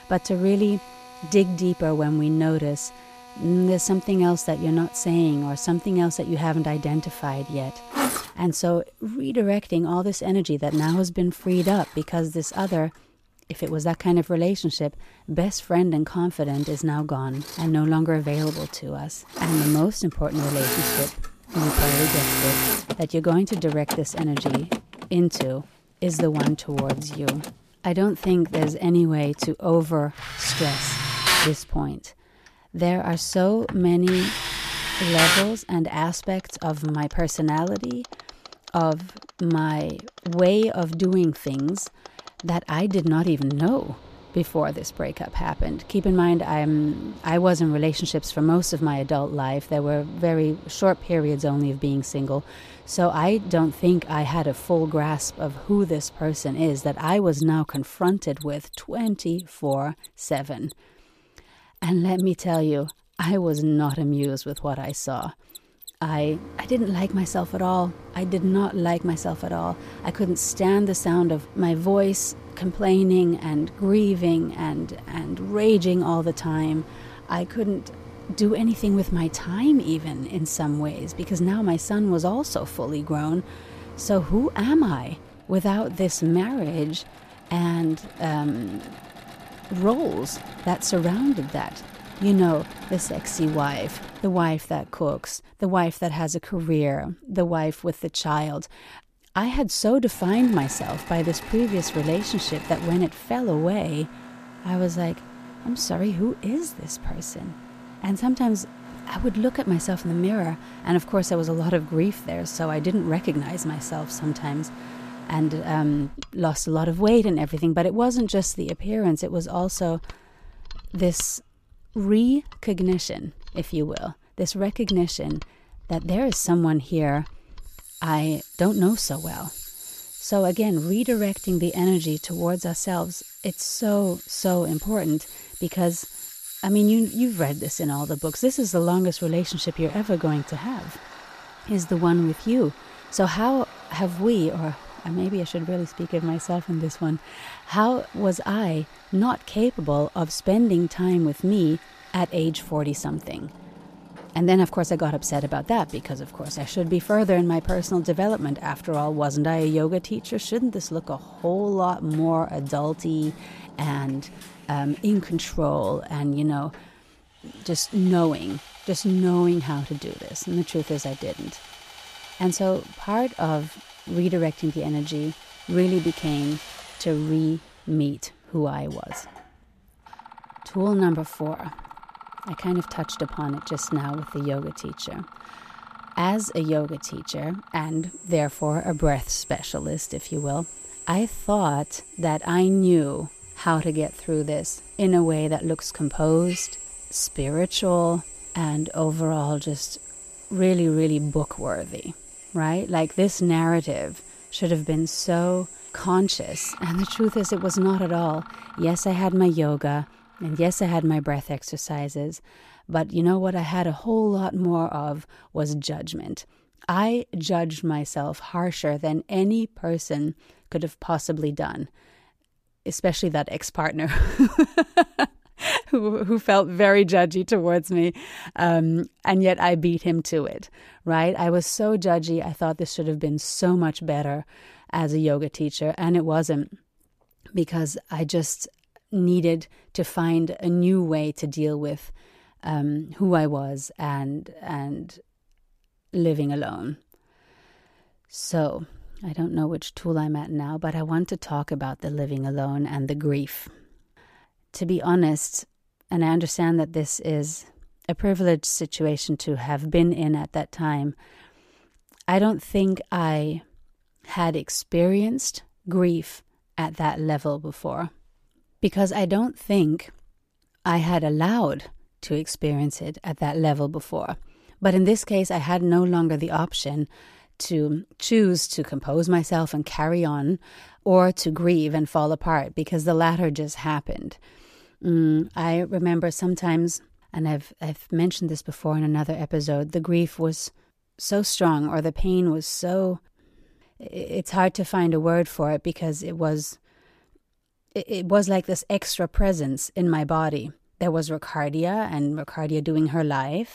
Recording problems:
machinery noise; noticeable; until 3:31; 10 dB below the speech

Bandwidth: 14.5 kHz